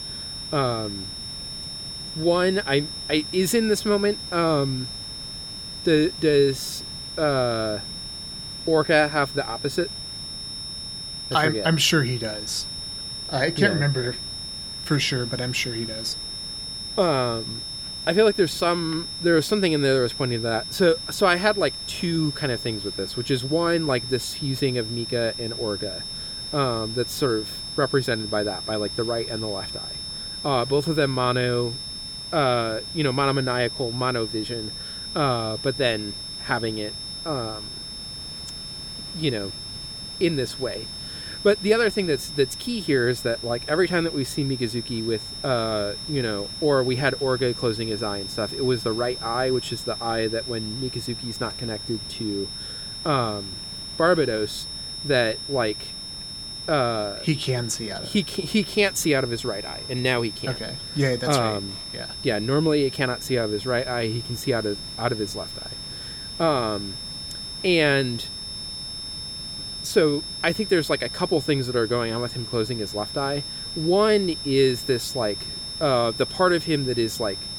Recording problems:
high-pitched whine; loud; throughout; 5.5 kHz, 7 dB below the speech
hiss; noticeable; throughout; 20 dB below the speech

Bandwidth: 18.5 kHz